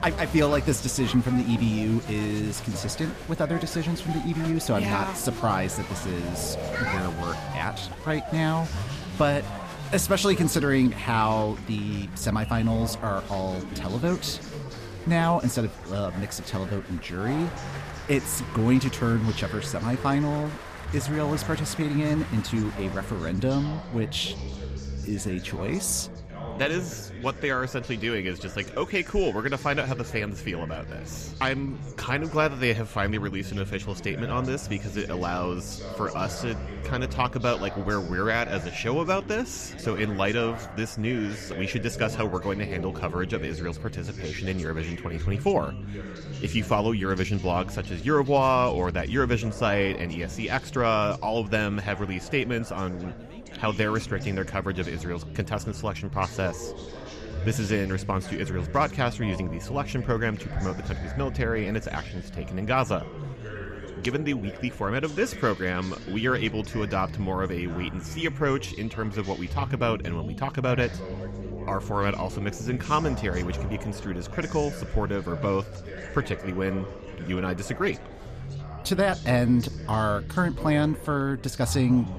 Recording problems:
chatter from many people; noticeable; throughout; 10 dB below the speech
low rumble; faint; throughout; 20 dB below the speech

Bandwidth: 14.5 kHz